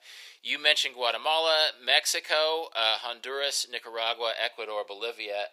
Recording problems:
thin; very; fading below 450 Hz

